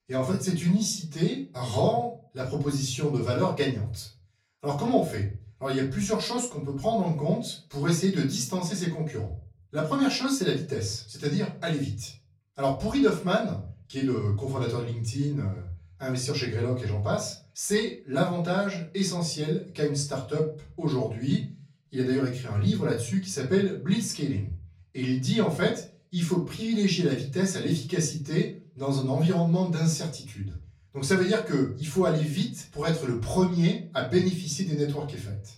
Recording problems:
off-mic speech; far
room echo; slight; dies away in 0.4 s

